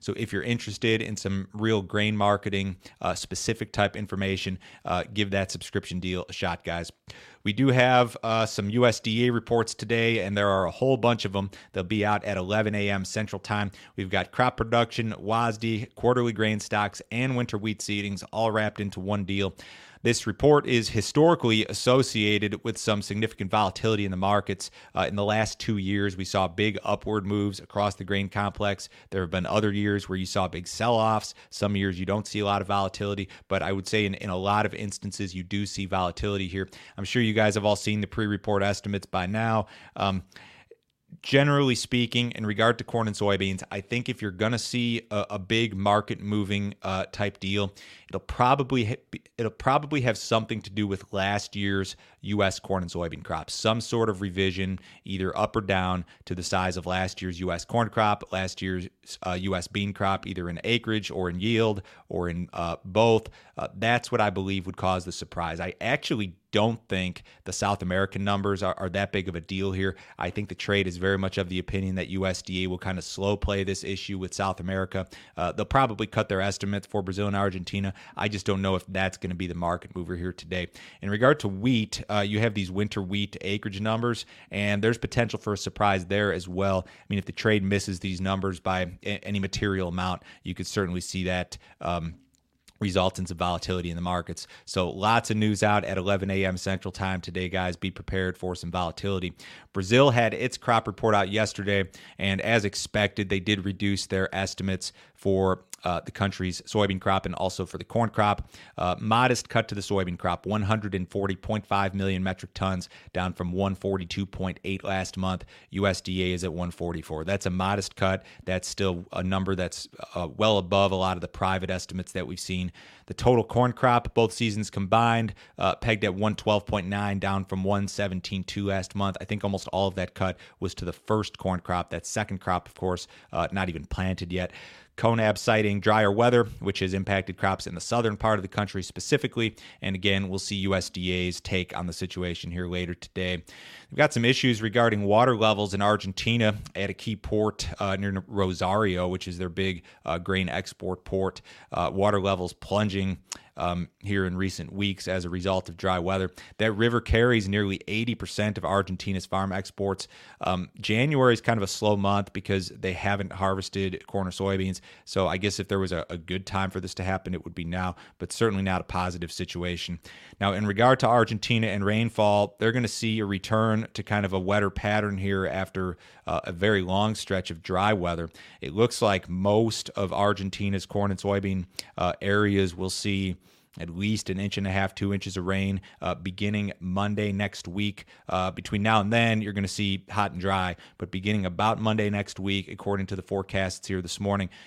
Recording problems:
none

